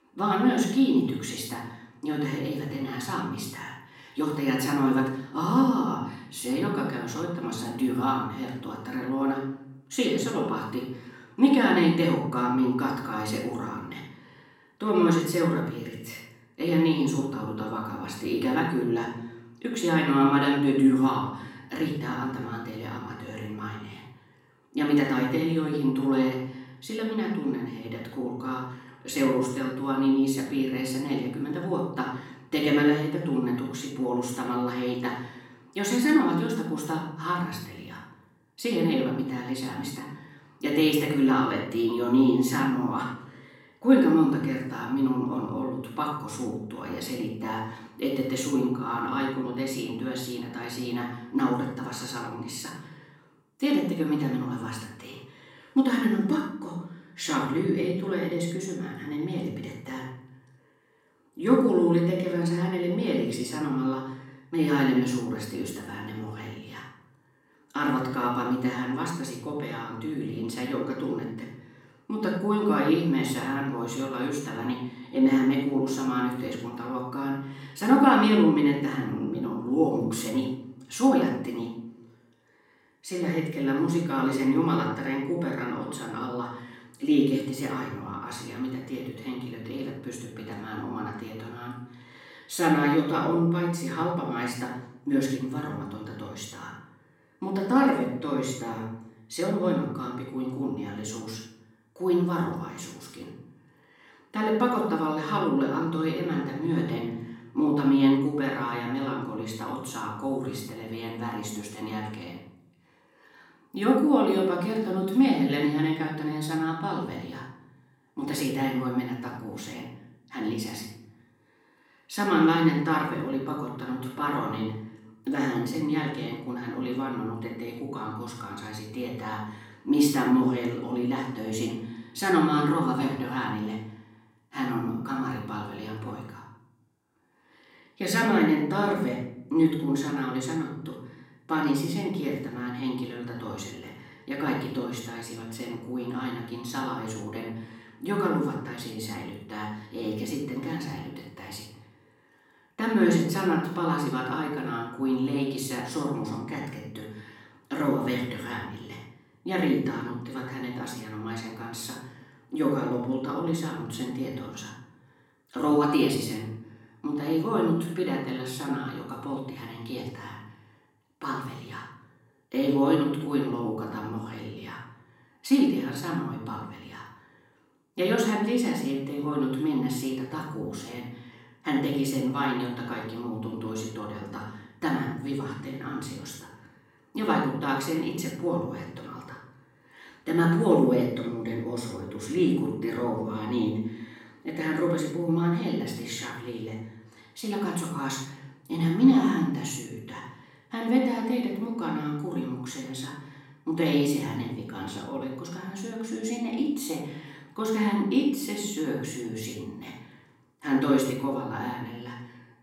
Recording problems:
off-mic speech; far
room echo; noticeable; dies away in 0.6 s

